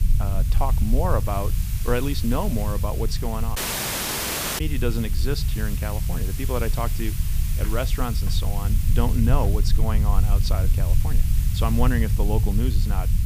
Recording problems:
hiss; loud; throughout; 9 dB below the speech
low rumble; noticeable; throughout; 10 dB below the speech
audio cutting out; at 3.5 s for 1 s

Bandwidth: 15 kHz